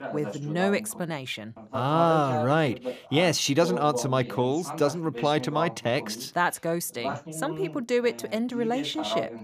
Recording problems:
voice in the background; loud; throughout; 9 dB below the speech

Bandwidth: 14.5 kHz